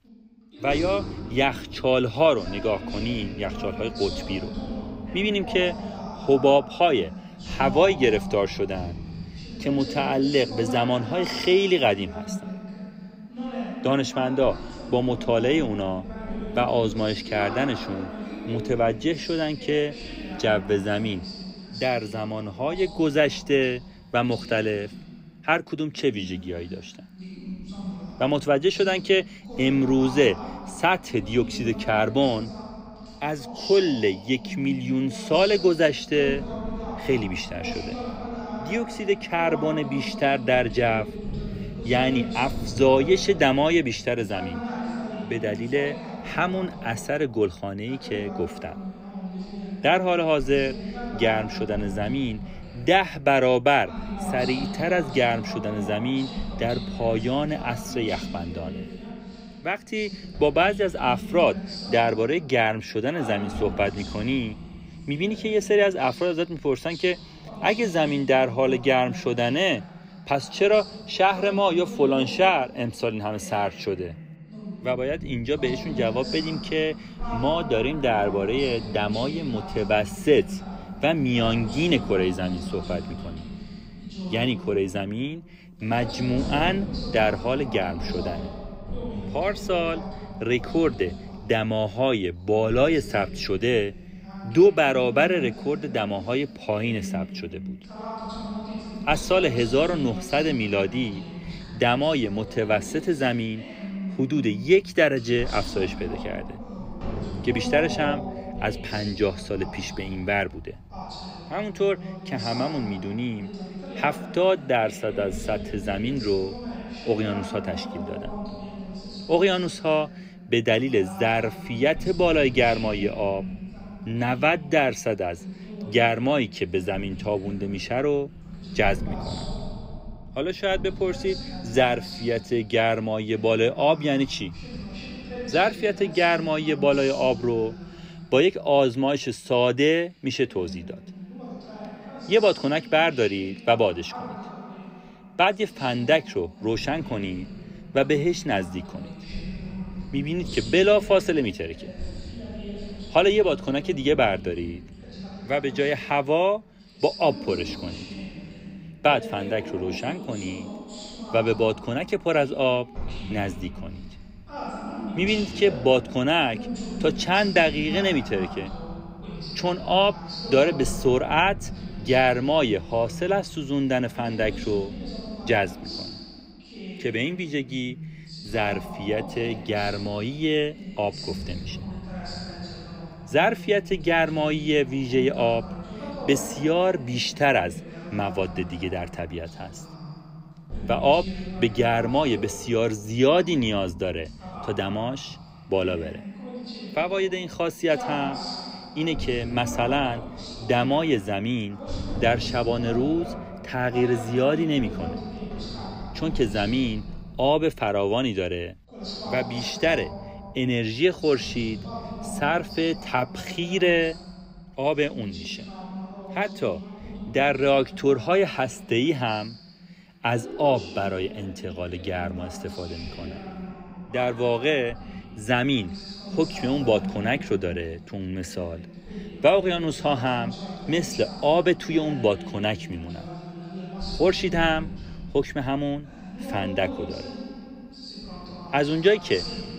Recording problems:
voice in the background; noticeable; throughout; 10 dB below the speech

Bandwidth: 15.5 kHz